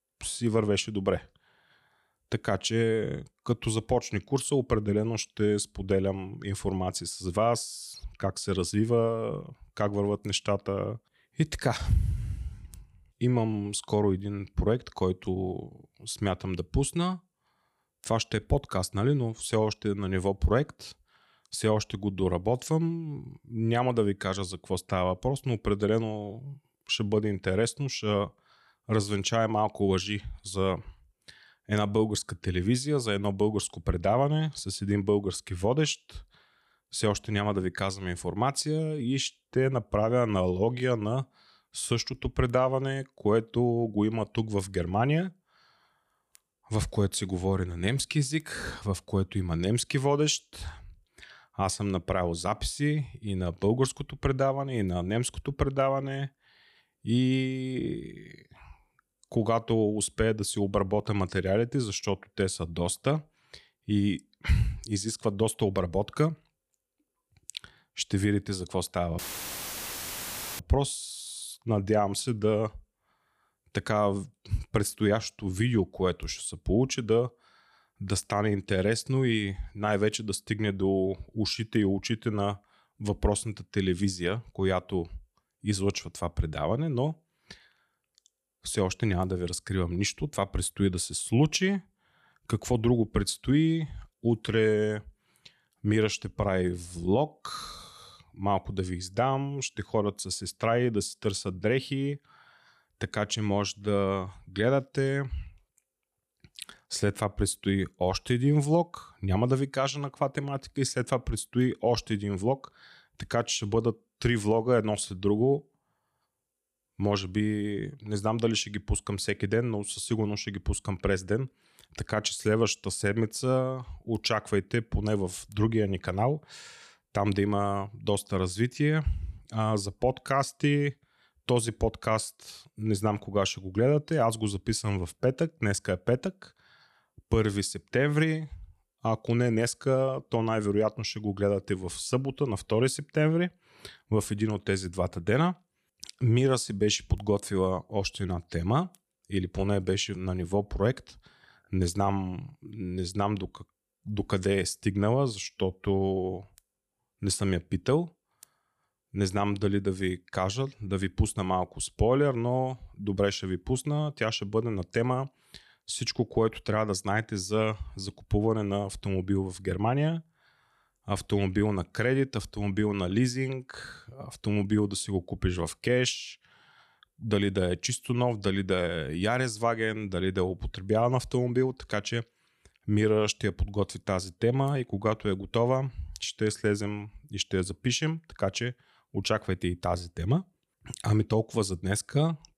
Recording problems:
audio cutting out; filled with static; at 1:09 for 1.5 s

